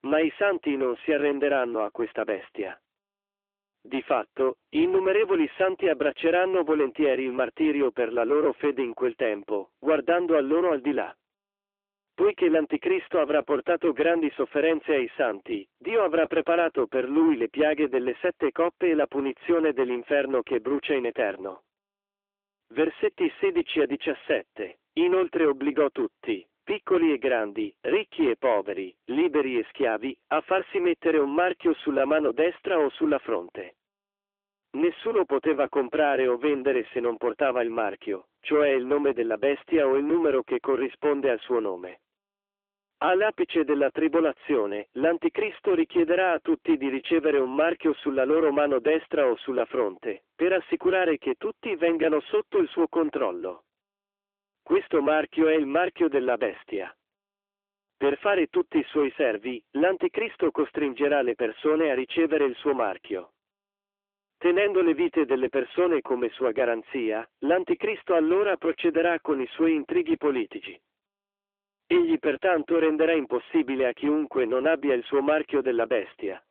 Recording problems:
phone-call audio; nothing above 3.5 kHz
distortion; slight; 9% of the sound clipped

